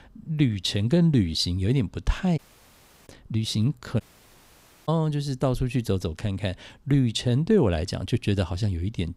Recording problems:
audio cutting out; at 2.5 s for 0.5 s and at 4 s for 1 s

